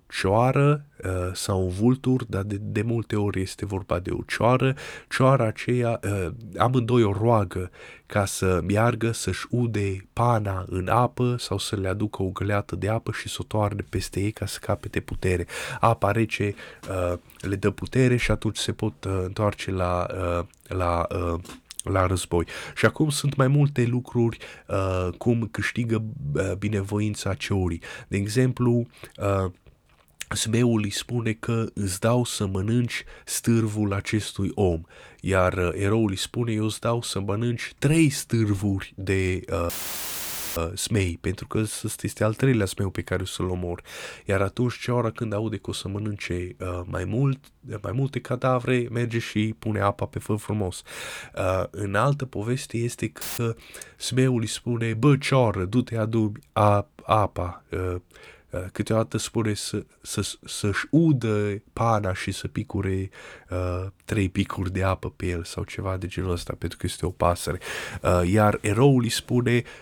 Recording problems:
audio cutting out; filled with static; at 40 s for 1 s and at 53 s

